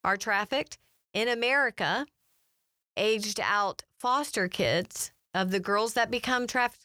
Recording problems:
none

